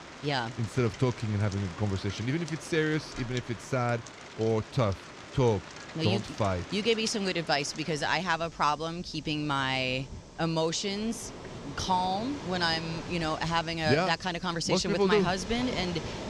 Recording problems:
rain or running water; noticeable; throughout; 15 dB below the speech

